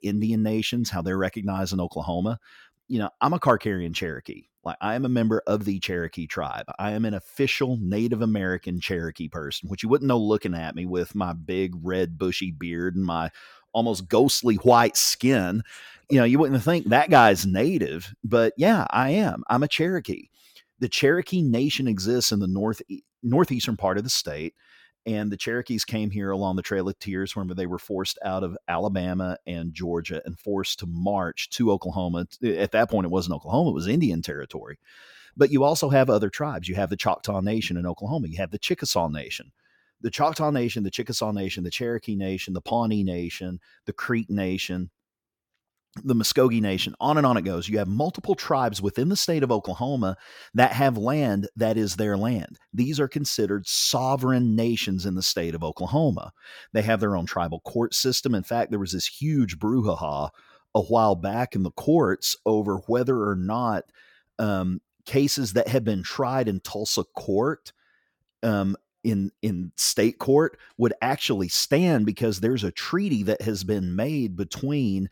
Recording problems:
none

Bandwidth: 17.5 kHz